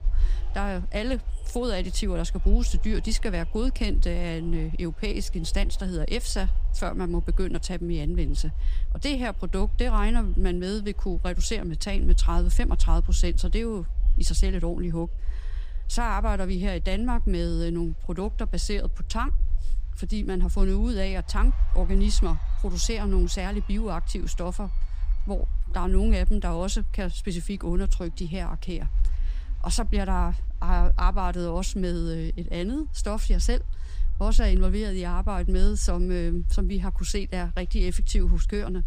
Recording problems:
crowd noise; faint; throughout; 25 dB below the speech
low rumble; faint; throughout; 20 dB below the speech

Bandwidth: 15 kHz